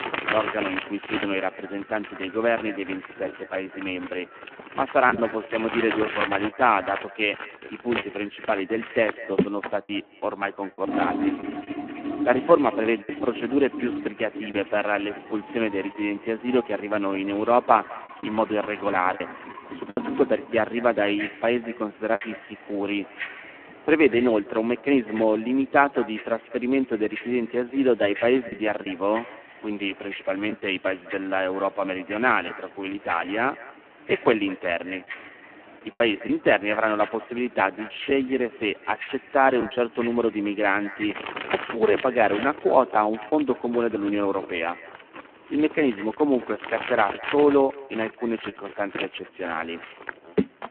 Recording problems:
phone-call audio; poor line
echo of what is said; faint; throughout; 200 ms later, 20 dB below the speech
household noises; loud; throughout; 10 dB below the speech
wind in the background; faint; throughout; 25 dB below the speech
choppy; occasionally; 3% of the speech affected

